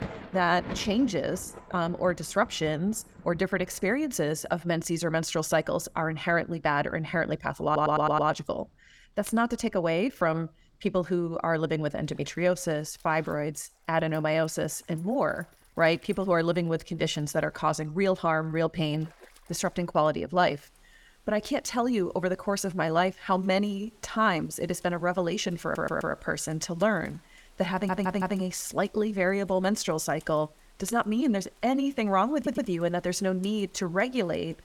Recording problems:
rain or running water; faint; throughout; 25 dB below the speech
audio stuttering; 4 times, first at 7.5 s

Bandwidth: 18 kHz